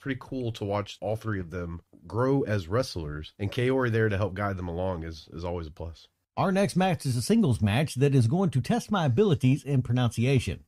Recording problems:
none

